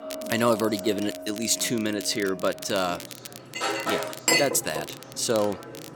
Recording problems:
household noises; loud; throughout; 3 dB below the speech
crackle, like an old record; noticeable; 15 dB below the speech
voice in the background; faint; throughout; 20 dB below the speech

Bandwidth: 17 kHz